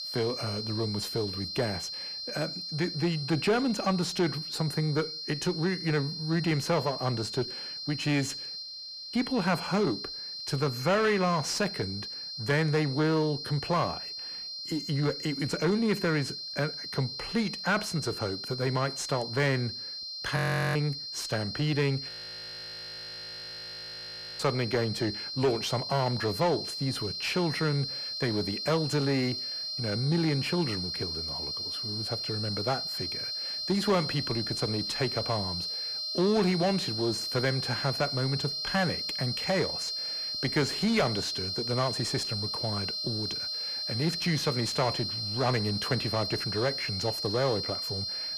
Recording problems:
distortion; slight; 10 dB below the speech
high-pitched whine; loud; throughout; 4 kHz, 4 dB below the speech
audio freezing; at 8.5 s for 0.5 s, at 20 s and at 22 s for 2.5 s

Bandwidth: 15 kHz